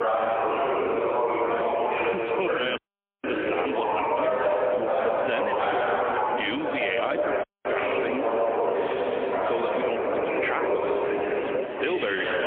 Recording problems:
phone-call audio; poor line; nothing above 3.5 kHz
squashed, flat; somewhat
chatter from many people; very loud; throughout; 5 dB above the speech
audio cutting out; at 3 s and at 7.5 s

